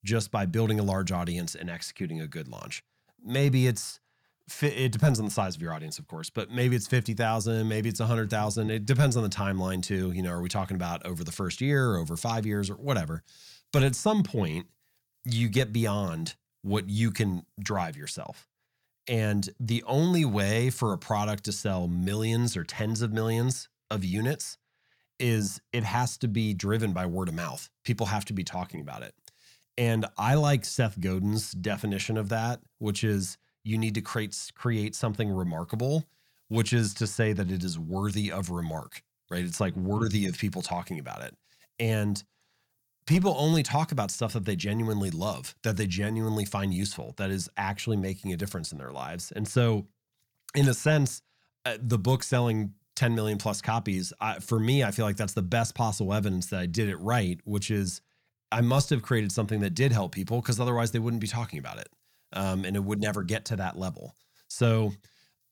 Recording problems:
none

